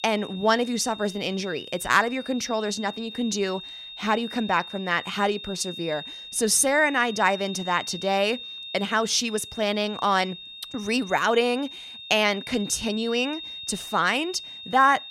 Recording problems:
high-pitched whine; noticeable; throughout; 3.5 kHz, 10 dB below the speech

